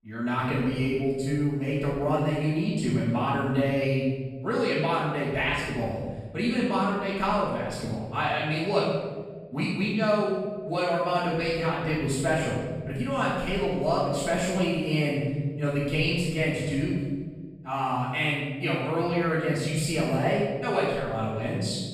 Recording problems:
room echo; strong; dies away in 1.4 s
off-mic speech; far

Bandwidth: 15 kHz